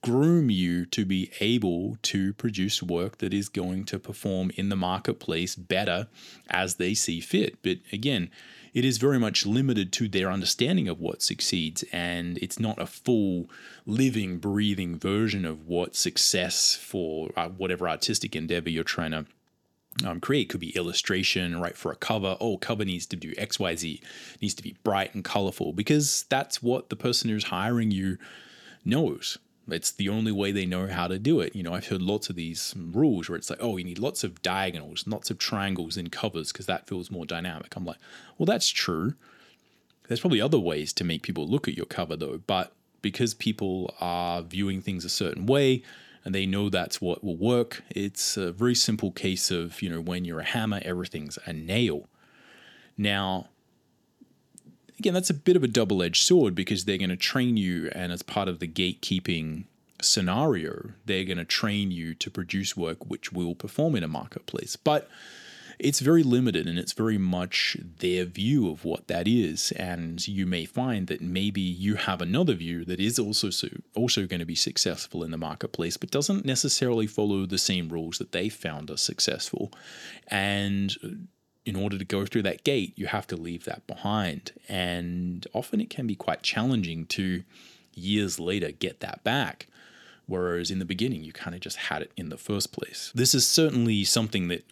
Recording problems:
none

